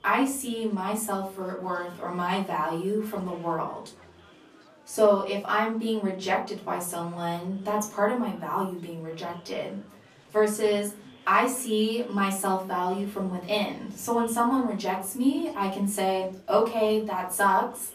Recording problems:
off-mic speech; far
room echo; slight; dies away in 0.3 s
murmuring crowd; faint; throughout; 25 dB below the speech

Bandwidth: 14.5 kHz